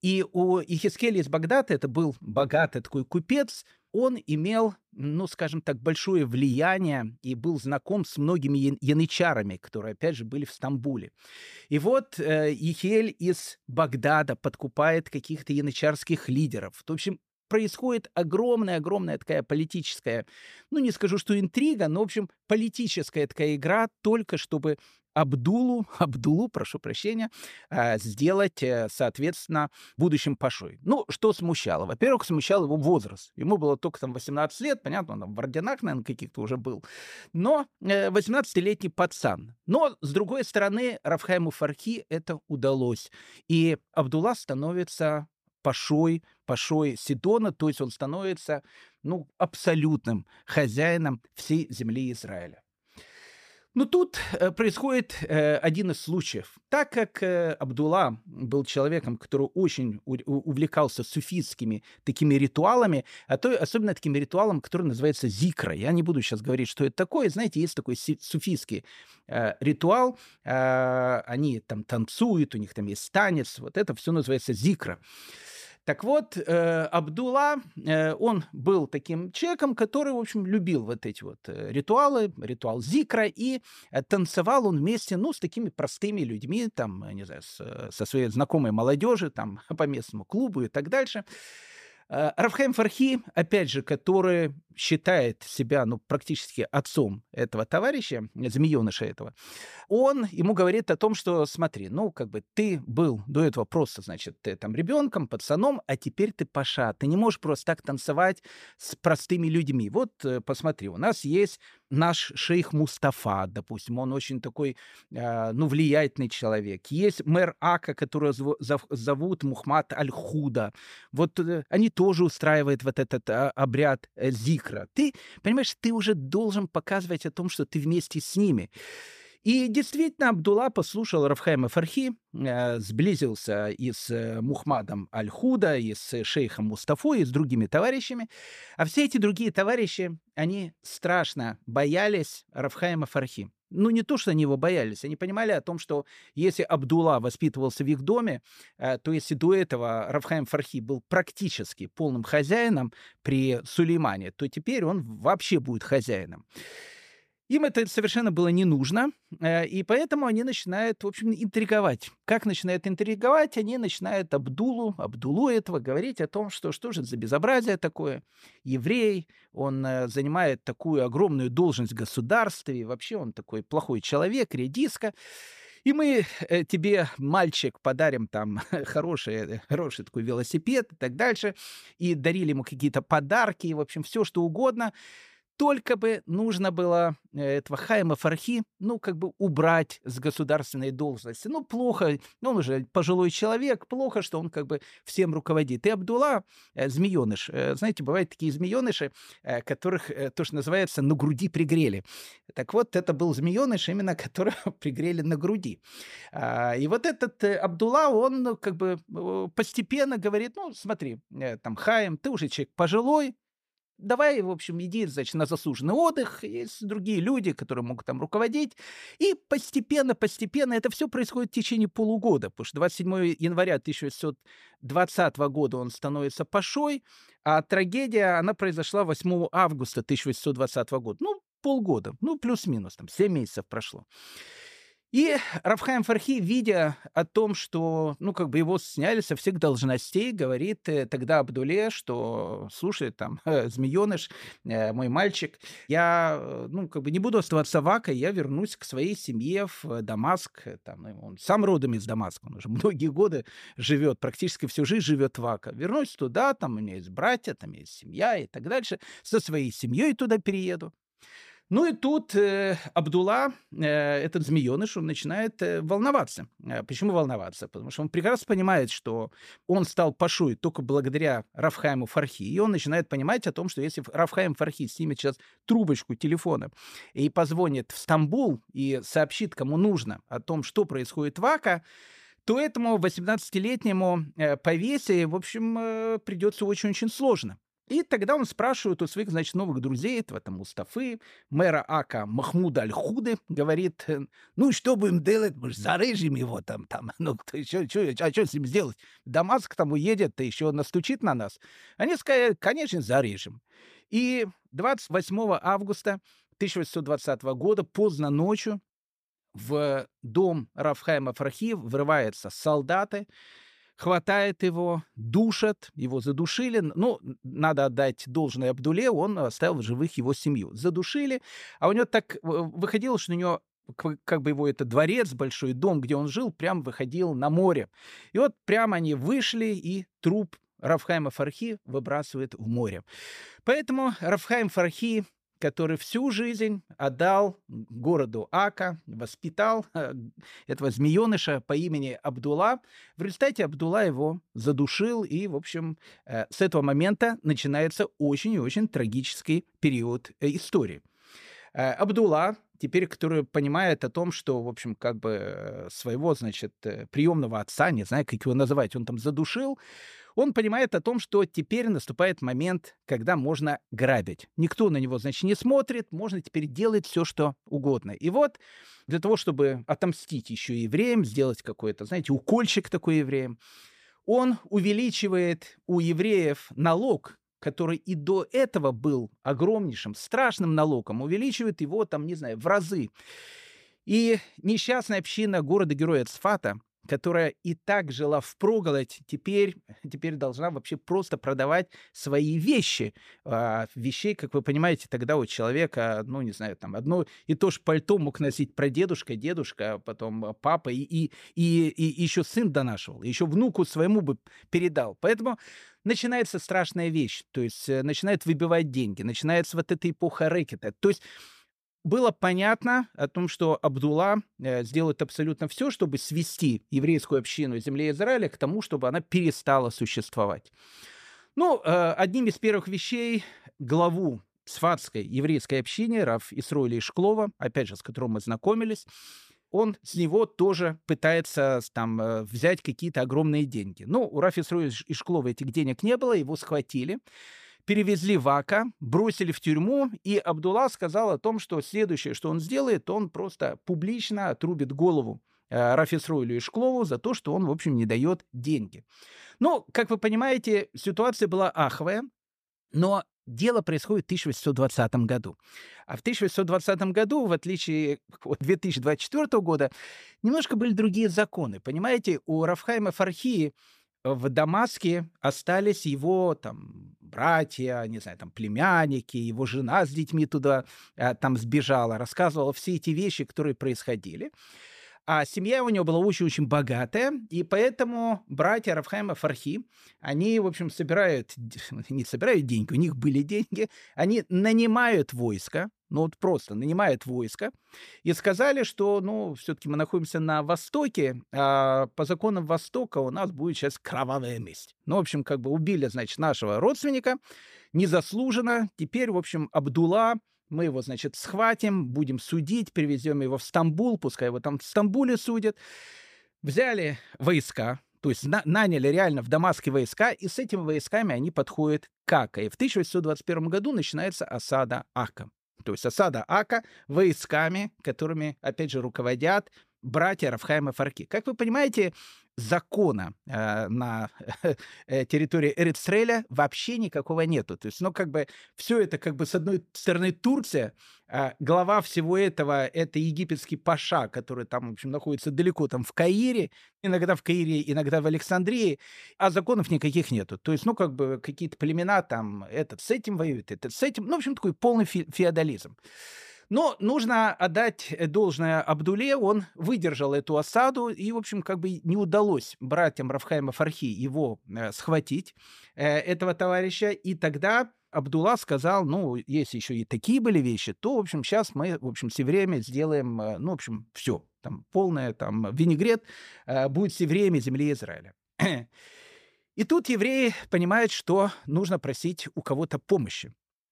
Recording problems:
none

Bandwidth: 14.5 kHz